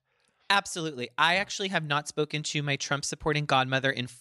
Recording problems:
none

